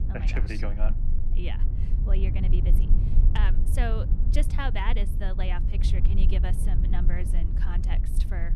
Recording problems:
low rumble; loud; throughout; 7 dB below the speech

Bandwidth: 14.5 kHz